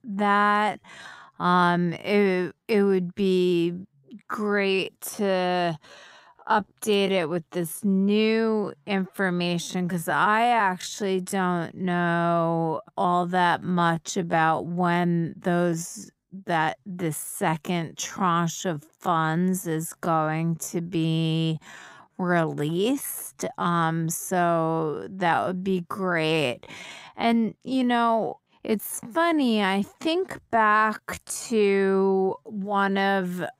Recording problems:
wrong speed, natural pitch; too slow; 0.6 times normal speed

